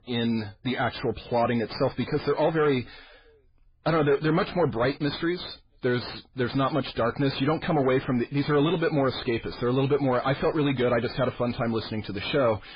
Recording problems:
garbled, watery; badly; nothing above 5 kHz
distortion; slight; 10 dB below the speech

